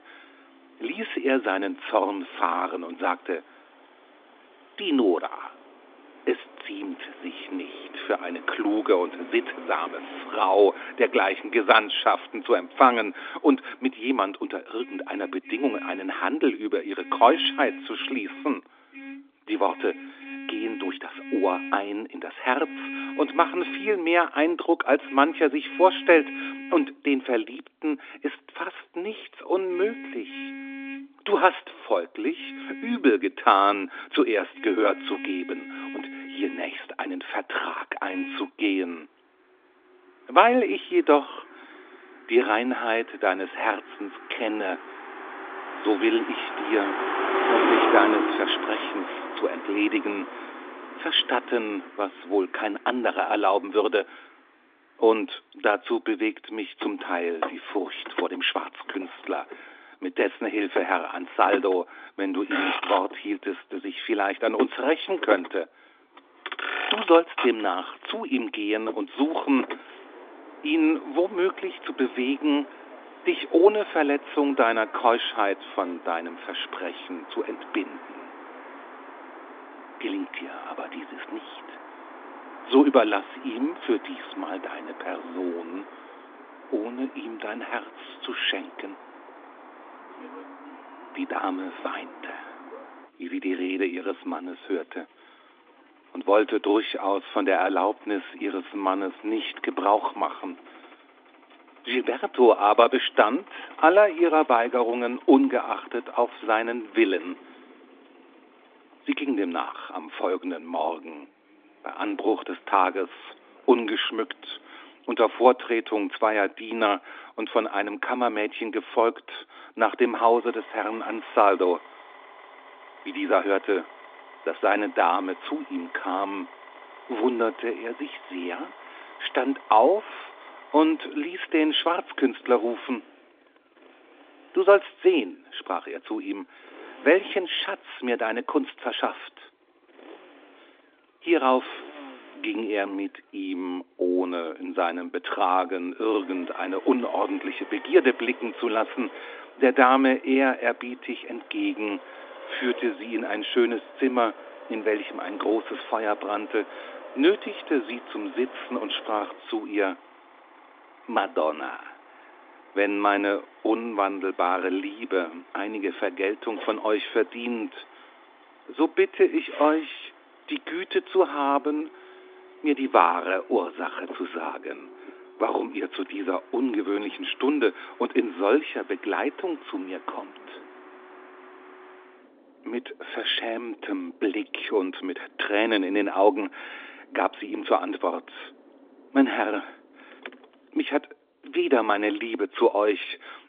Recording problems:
phone-call audio; nothing above 3 kHz
traffic noise; noticeable; throughout; 10 dB below the speech

